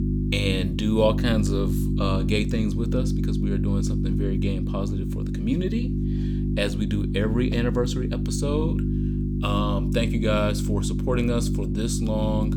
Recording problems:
electrical hum; loud; throughout; 50 Hz, 5 dB below the speech

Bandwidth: 18.5 kHz